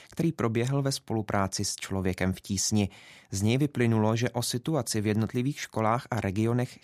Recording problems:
none

